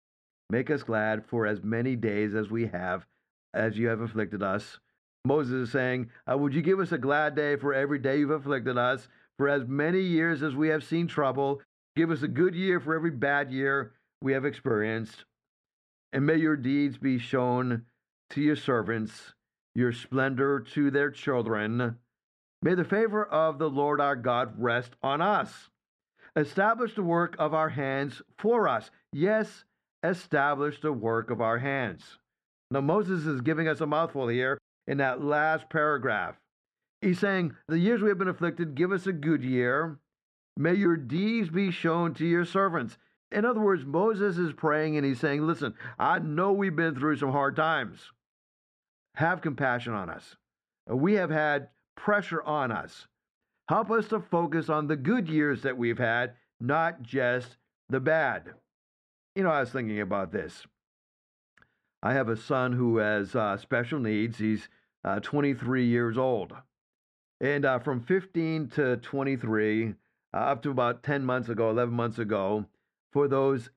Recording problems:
muffled; slightly; fading above 2.5 kHz

